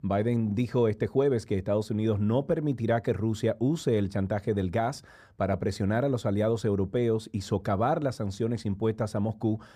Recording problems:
muffled; slightly; fading above 2 kHz

